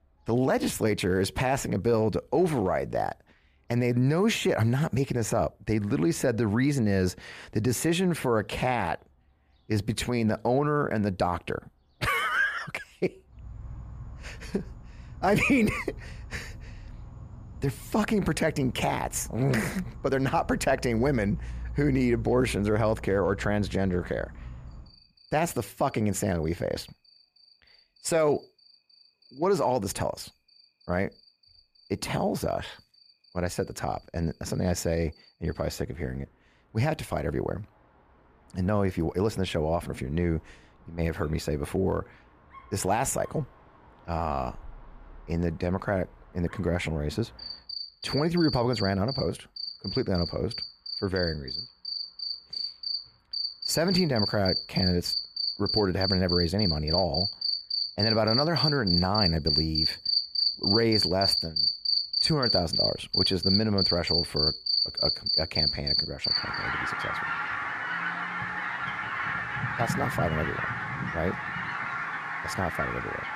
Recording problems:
animal sounds; loud; throughout; as loud as the speech

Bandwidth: 14.5 kHz